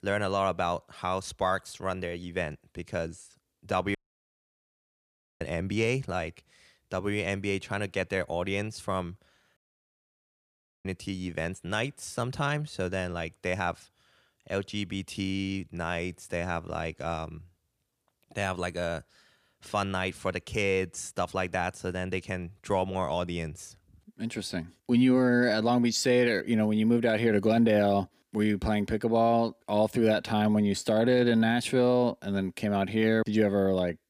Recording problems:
audio cutting out; at 4 s for 1.5 s and at 9.5 s for 1.5 s

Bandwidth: 15 kHz